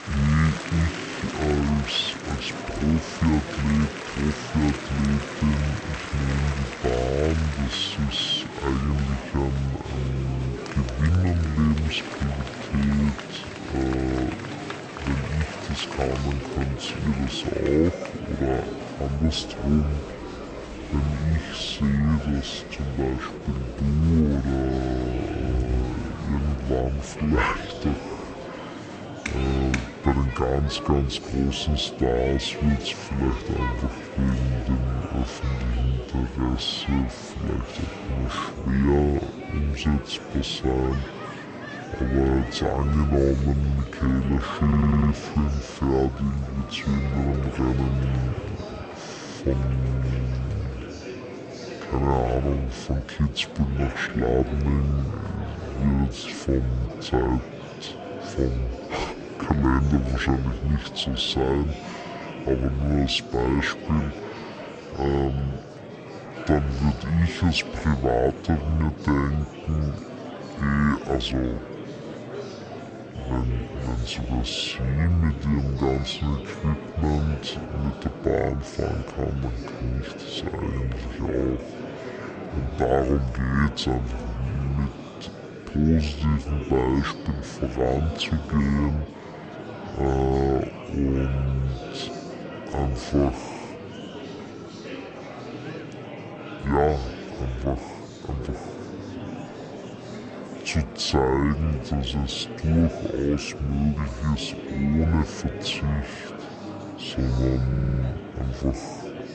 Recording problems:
wrong speed and pitch; too slow and too low; 0.6 times normal speed
murmuring crowd; loud; throughout; 10 dB below the speech
audio stuttering; at 45 s and at 1:48

